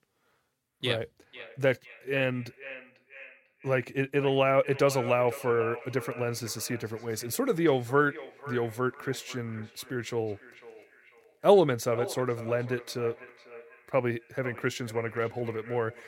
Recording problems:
echo of what is said; noticeable; throughout; 500 ms later, 15 dB below the speech

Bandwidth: 16.5 kHz